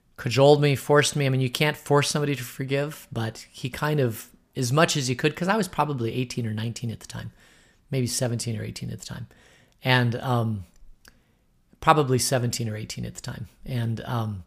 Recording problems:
none

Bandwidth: 15 kHz